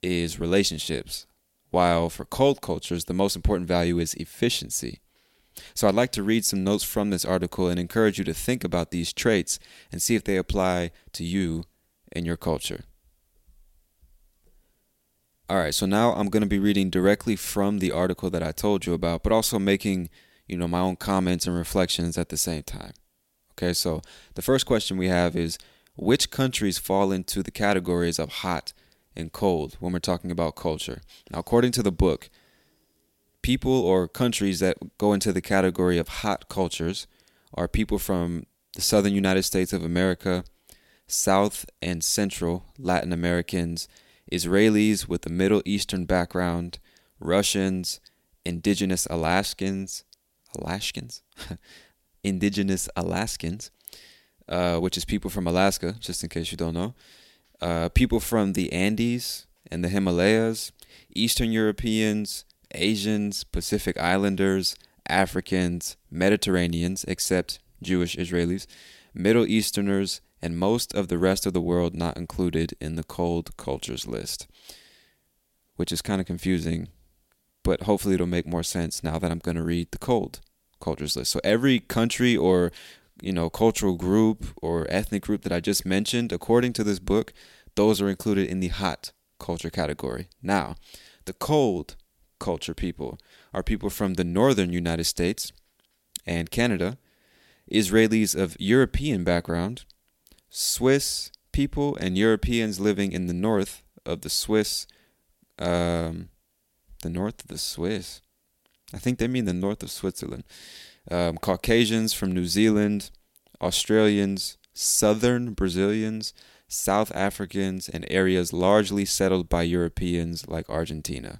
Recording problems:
none

